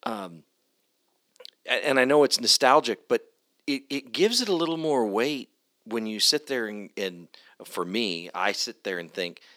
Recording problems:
thin; somewhat; fading below 450 Hz

